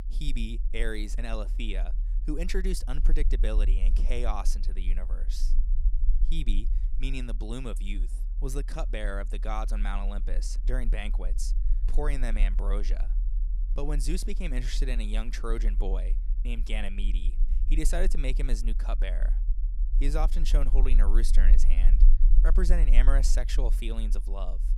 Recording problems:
low rumble; noticeable; throughout; 15 dB below the speech

